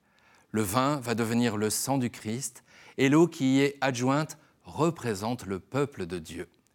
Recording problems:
none

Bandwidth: 18 kHz